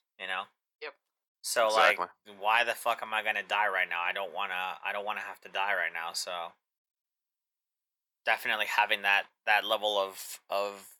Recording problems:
thin; very; fading below 650 Hz

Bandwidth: 18 kHz